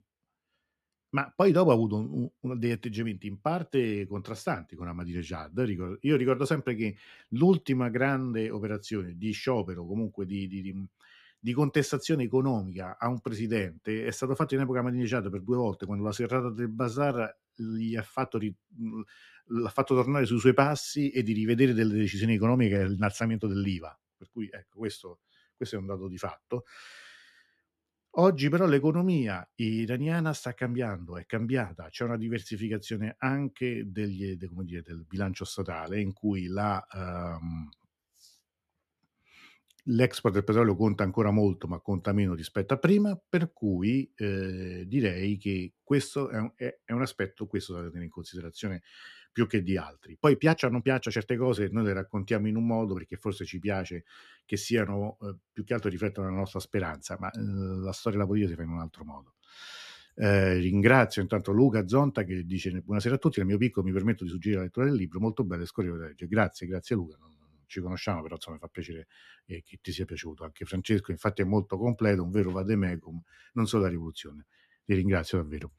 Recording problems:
uneven, jittery; strongly; from 16 s to 1:13

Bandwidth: 13.5 kHz